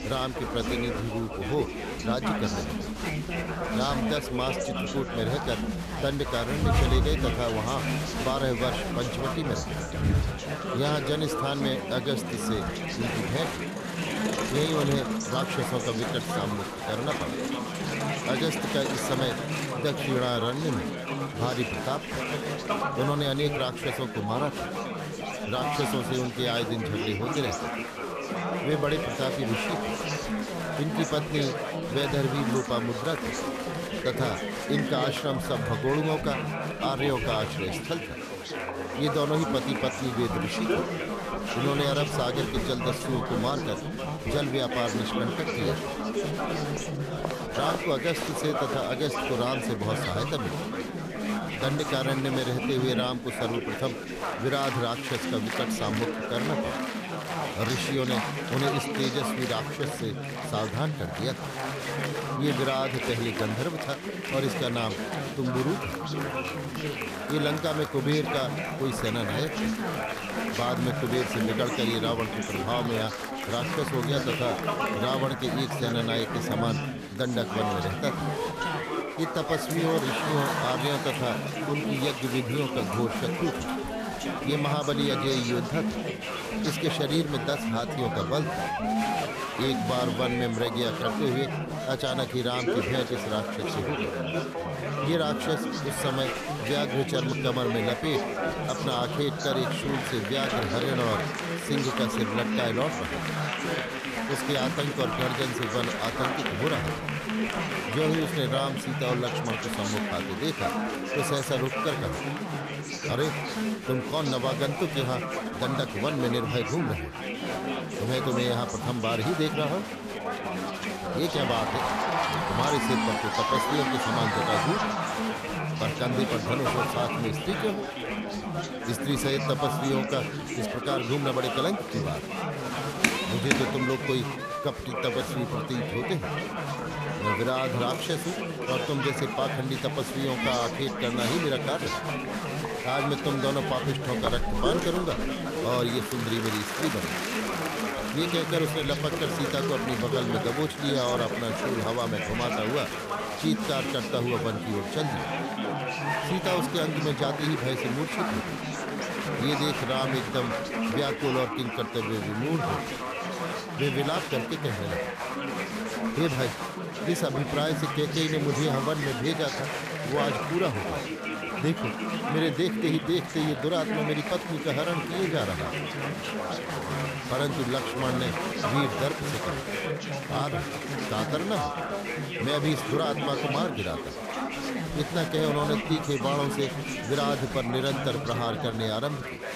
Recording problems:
chatter from many people; loud; throughout; as loud as the speech

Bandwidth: 14.5 kHz